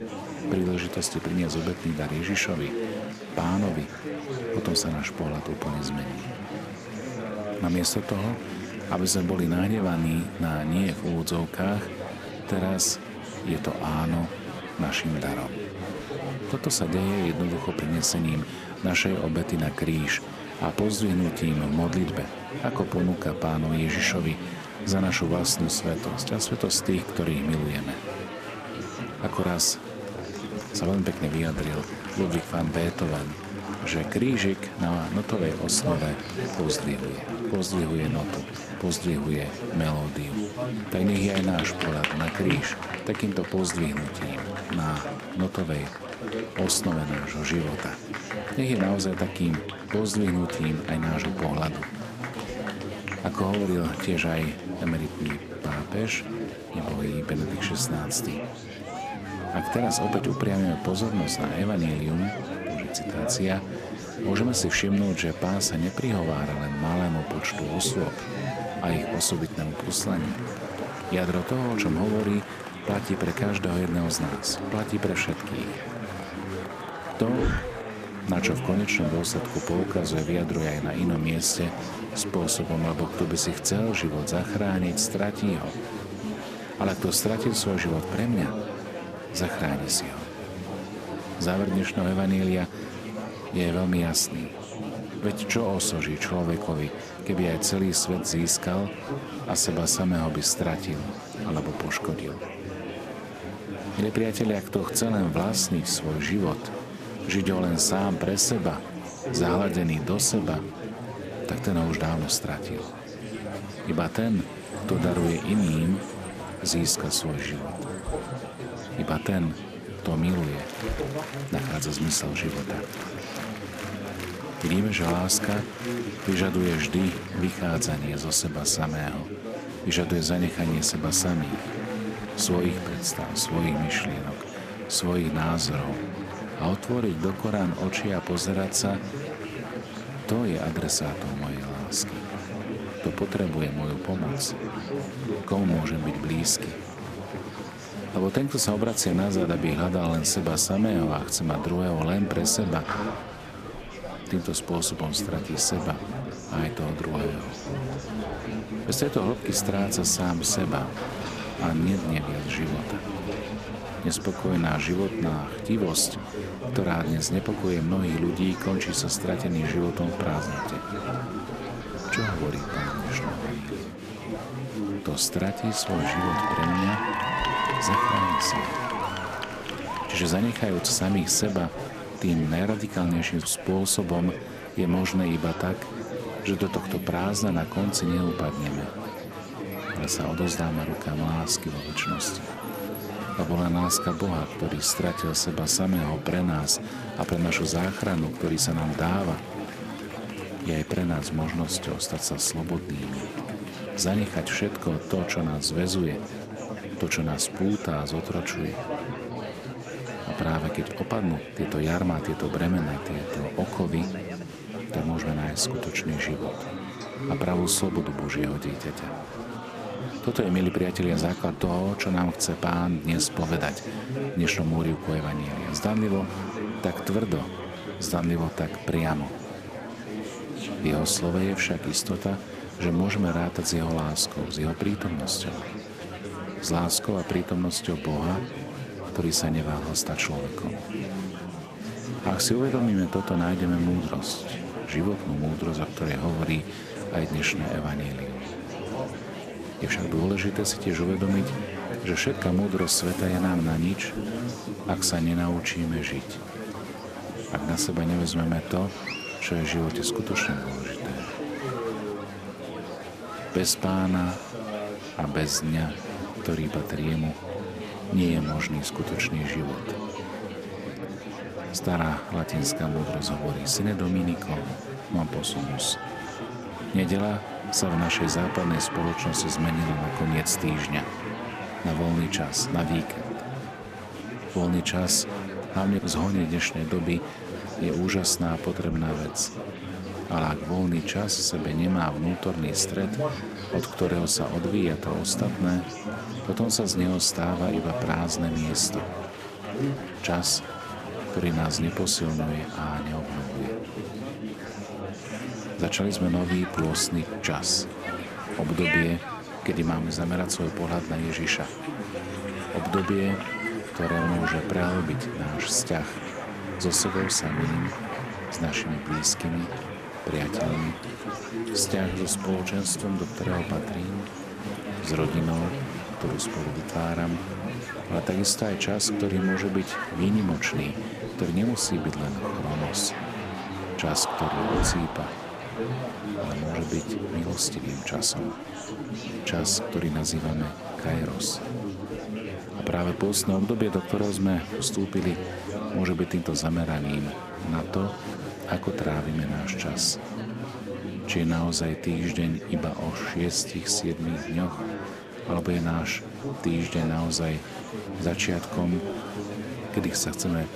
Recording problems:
murmuring crowd; loud; throughout; 6 dB below the speech

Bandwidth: 14.5 kHz